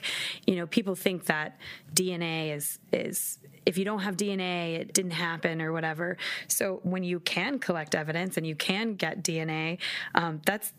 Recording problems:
squashed, flat; heavily

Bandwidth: 15 kHz